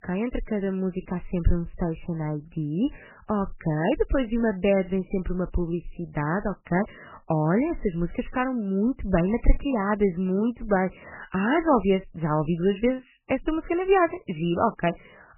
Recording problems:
garbled, watery; badly; nothing above 3 kHz

